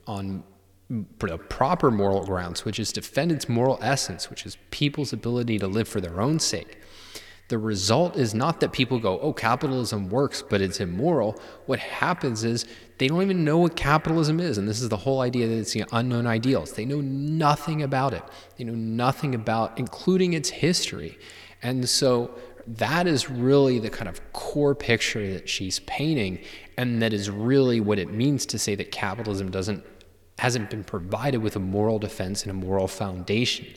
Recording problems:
echo of what is said; faint; throughout; 150 ms later, 20 dB below the speech

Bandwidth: 18 kHz